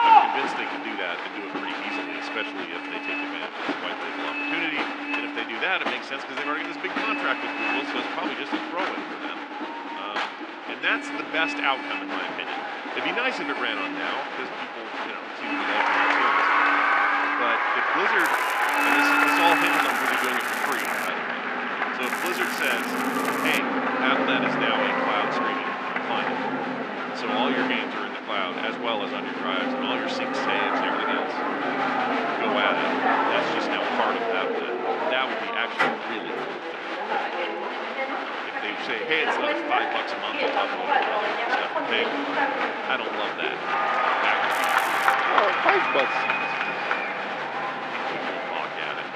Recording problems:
muffled; slightly; fading above 3 kHz
thin; somewhat; fading below 250 Hz
crowd noise; very loud; throughout; 3 dB above the speech
traffic noise; loud; throughout; 1 dB below the speech
crackling; loud; from 18 to 21 s, from 22 to 24 s and at 45 s; 9 dB below the speech

